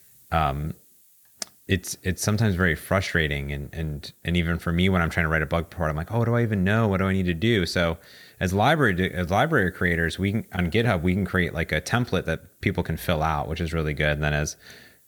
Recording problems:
hiss; faint; throughout; 30 dB below the speech

